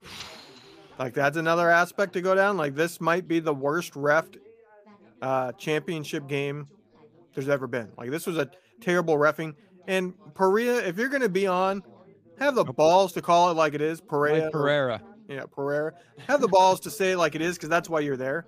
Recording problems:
background chatter; faint; throughout; 3 voices, 30 dB below the speech

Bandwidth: 15 kHz